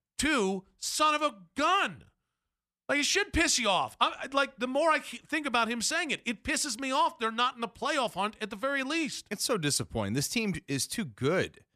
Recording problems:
none

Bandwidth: 14 kHz